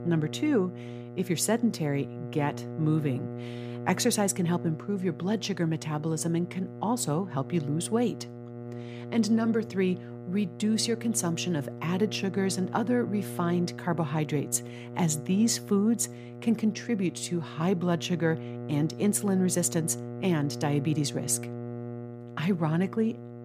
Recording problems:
electrical hum; noticeable; throughout; 60 Hz, 10 dB below the speech

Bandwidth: 15 kHz